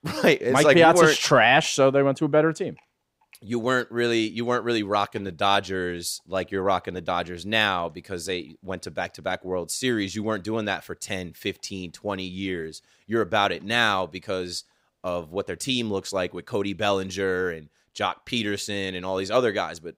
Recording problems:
none

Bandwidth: 15.5 kHz